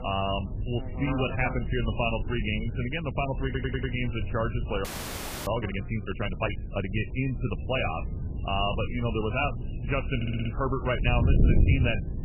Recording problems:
garbled, watery; badly; nothing above 3 kHz
electrical hum; noticeable; throughout; 60 Hz, 15 dB below the speech
wind noise on the microphone; occasional gusts; 15 dB below the speech
audio stuttering; at 3.5 s and at 10 s
audio freezing; at 5 s for 0.5 s

